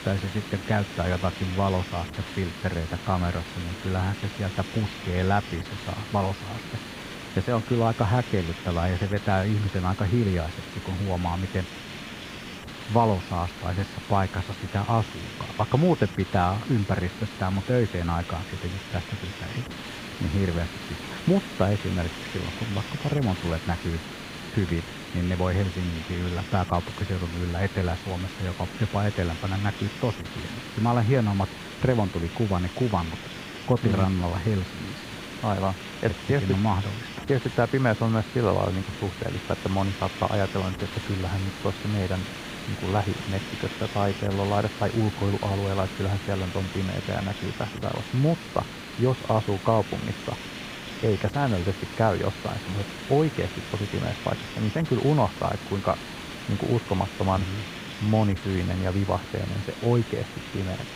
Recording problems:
muffled; very; fading above 1.5 kHz
hiss; loud; throughout; 9 dB below the speech

